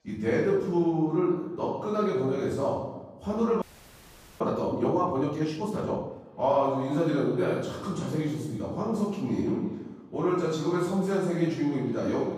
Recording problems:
room echo; strong; dies away in 0.8 s
off-mic speech; far
echo of what is said; faint; from 6.5 s on; 340 ms later, 25 dB below the speech
background chatter; faint; throughout; 4 voices, 25 dB below the speech
audio freezing; at 3.5 s for 1 s

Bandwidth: 15 kHz